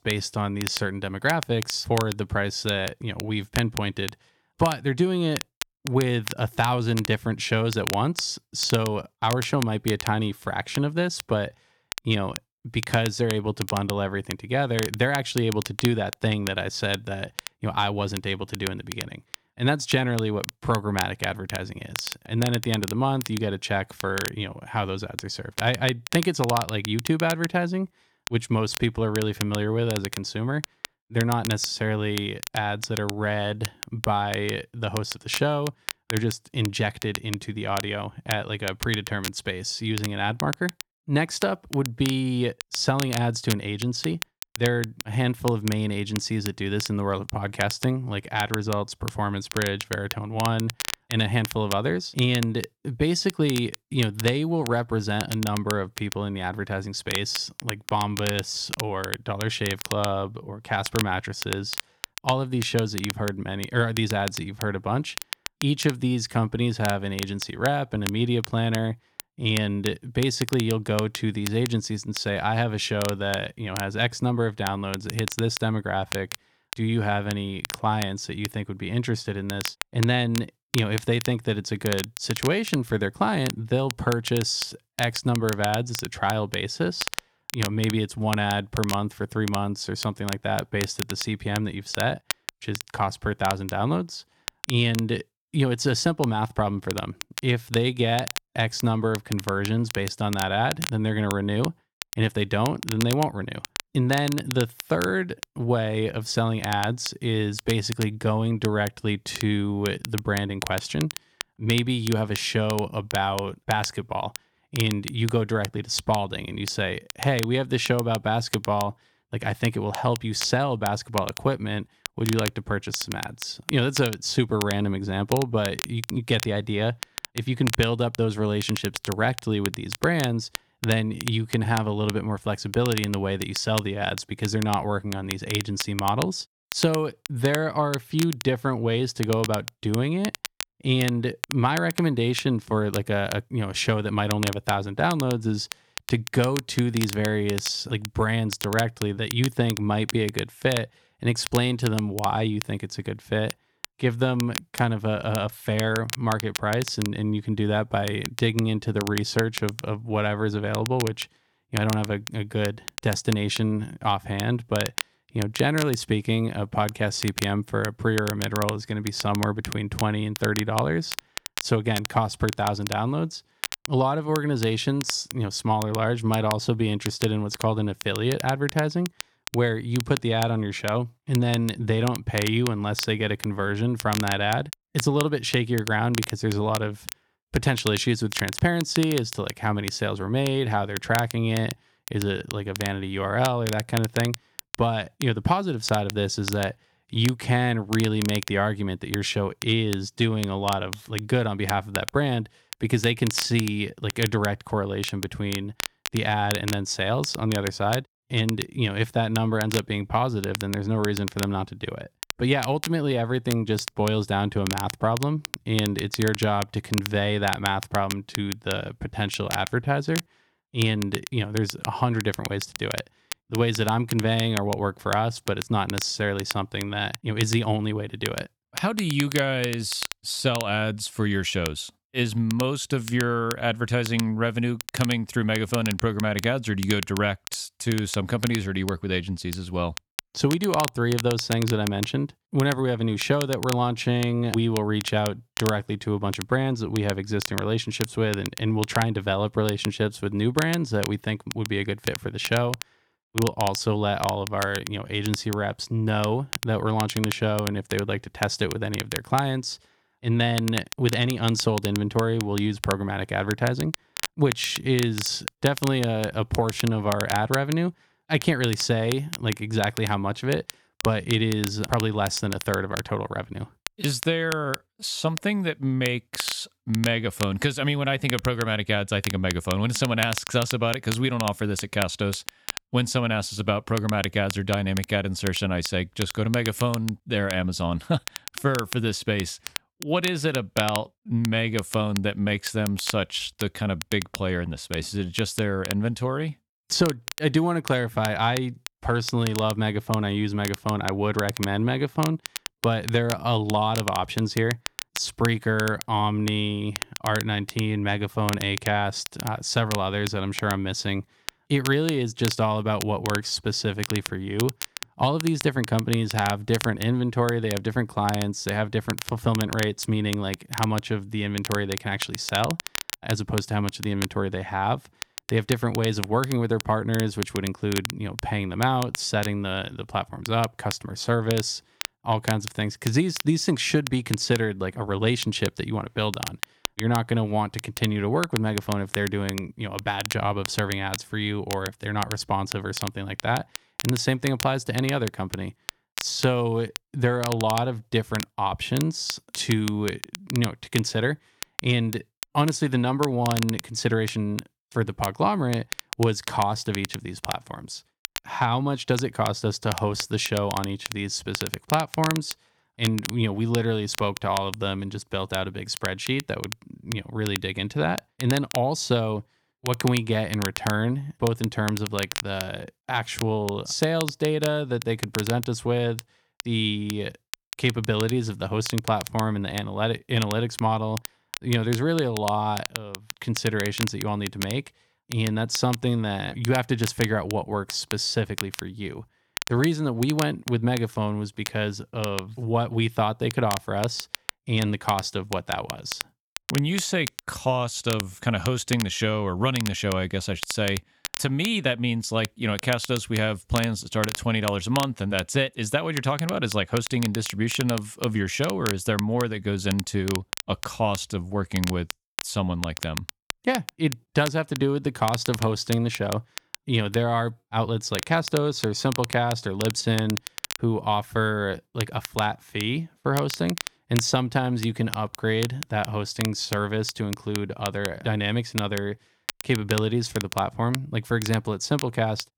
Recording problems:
crackle, like an old record; loud; 10 dB below the speech

